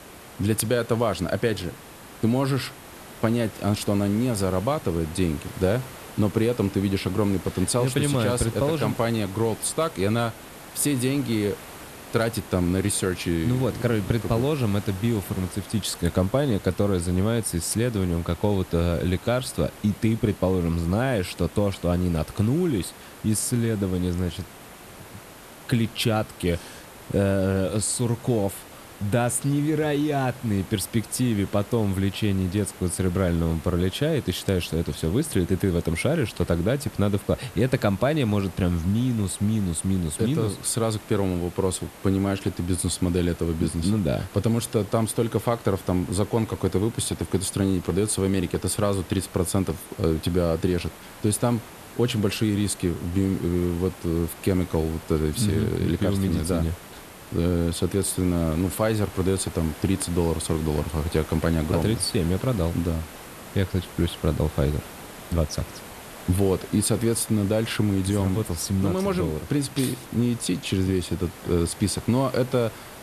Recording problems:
hiss; noticeable; throughout; 15 dB below the speech

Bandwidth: 13.5 kHz